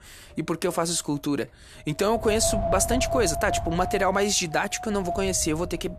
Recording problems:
wind noise on the microphone; heavy; 5 dB below the speech

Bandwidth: 13.5 kHz